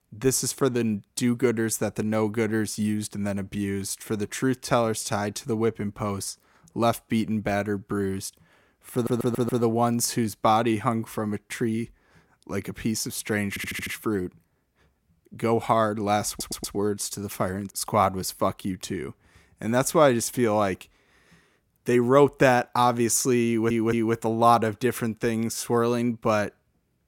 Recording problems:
audio stuttering; 4 times, first at 9 s

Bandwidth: 16.5 kHz